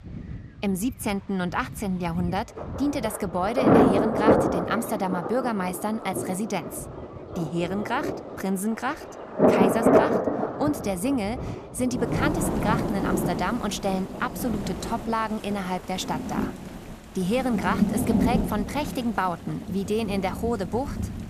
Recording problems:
rain or running water; very loud; throughout; 2 dB above the speech

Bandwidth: 14.5 kHz